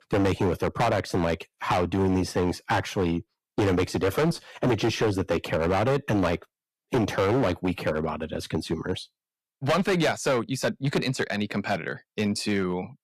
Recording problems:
distortion; heavy; 11% of the sound clipped

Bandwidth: 14.5 kHz